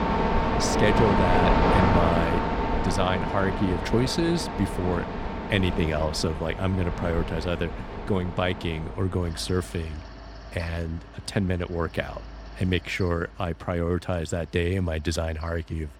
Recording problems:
machinery noise; very loud; throughout; as loud as the speech

